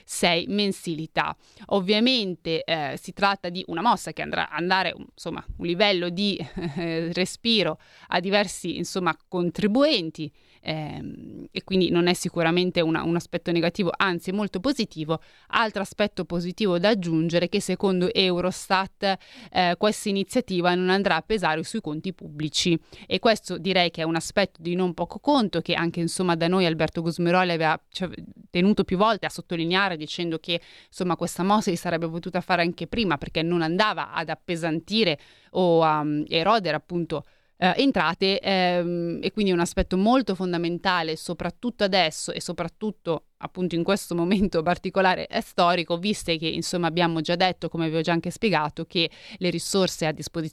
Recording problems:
uneven, jittery; strongly; from 1.5 to 38 s

